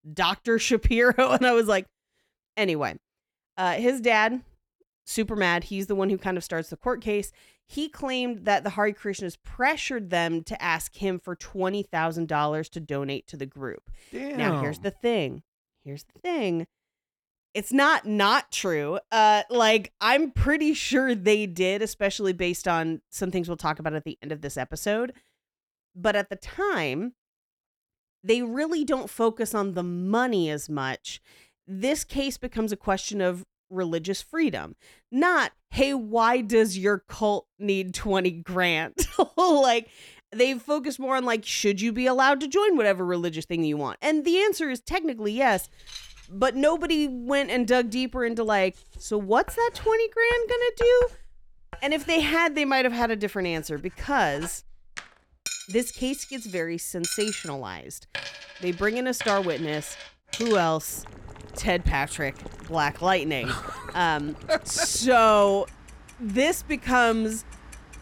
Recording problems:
household noises; noticeable; from 45 s on; 15 dB below the speech

